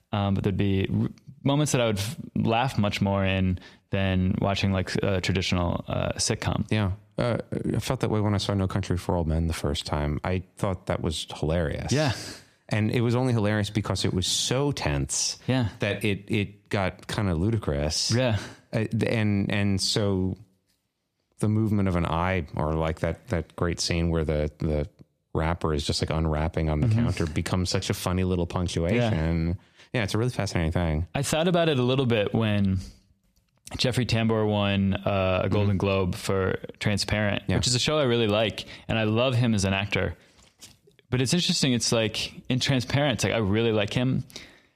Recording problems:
squashed, flat; somewhat

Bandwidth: 14.5 kHz